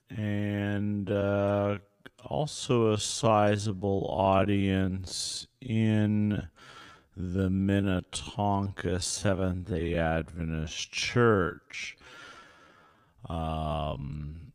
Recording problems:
wrong speed, natural pitch; too slow; 0.5 times normal speed

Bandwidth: 15 kHz